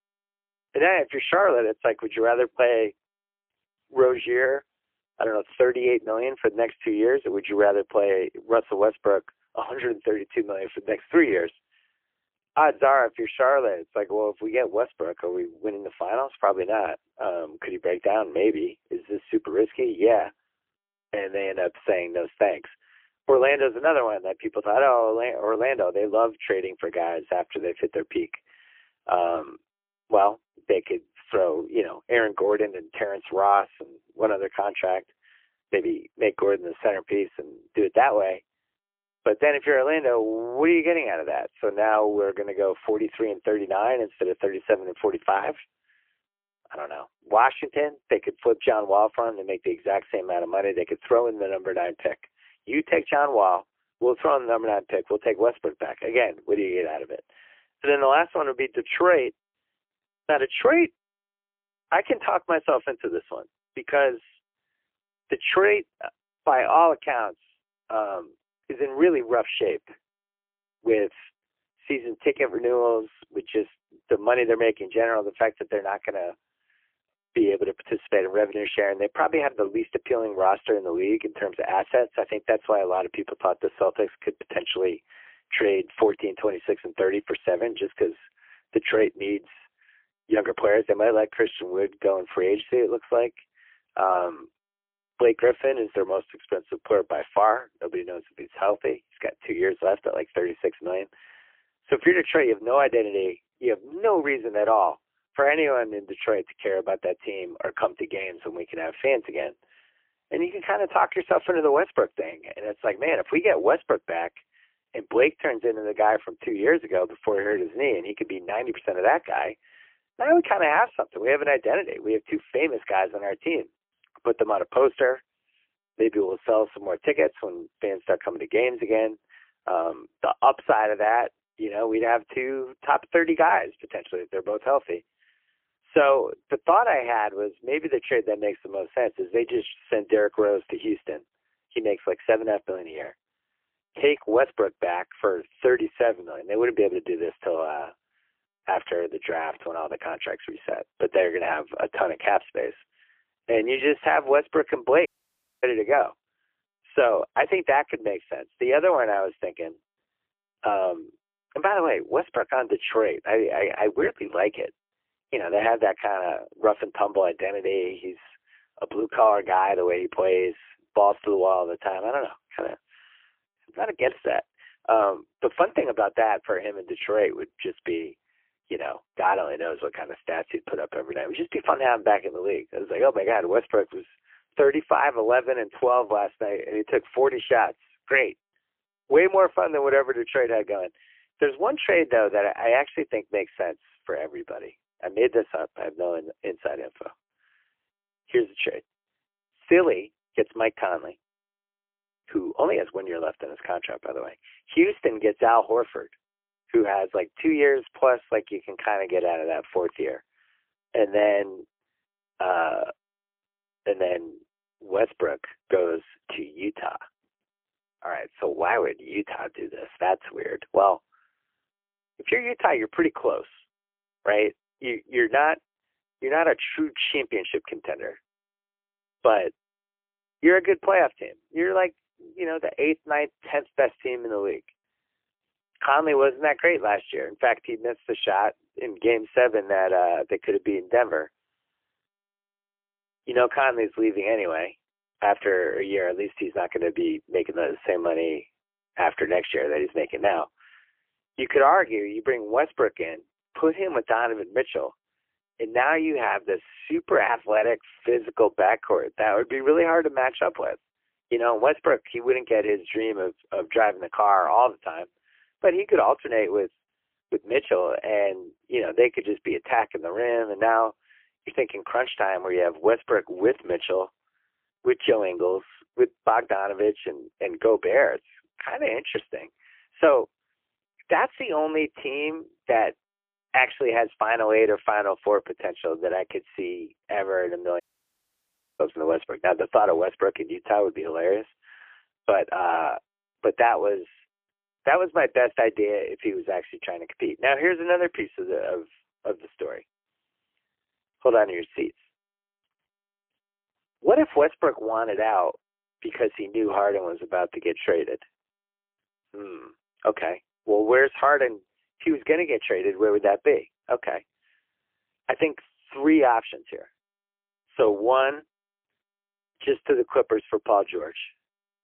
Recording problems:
phone-call audio; poor line; nothing above 3 kHz
audio cutting out; at 2:35 for 0.5 s and at 4:48 for 1 s

